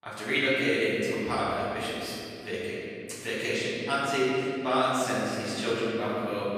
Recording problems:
room echo; strong; dies away in 2.5 s
off-mic speech; far

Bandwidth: 14.5 kHz